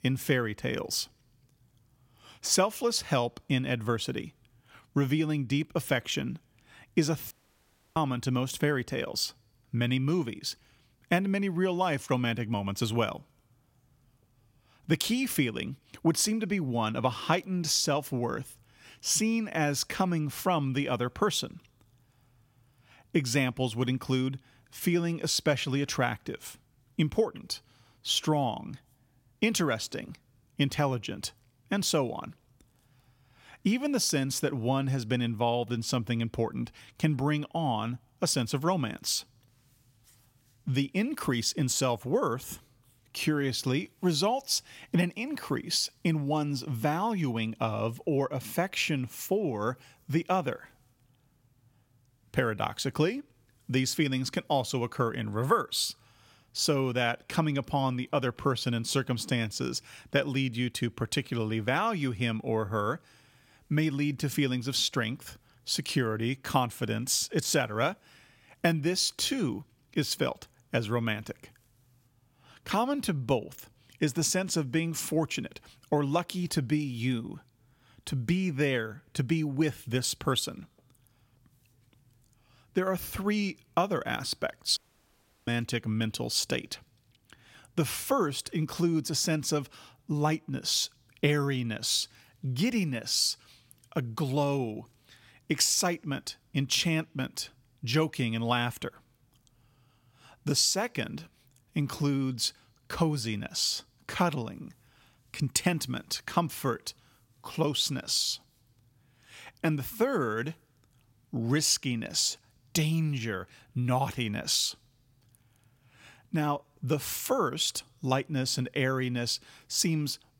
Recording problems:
audio cutting out; at 7.5 s for 0.5 s and at 1:25 for 0.5 s

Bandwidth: 16.5 kHz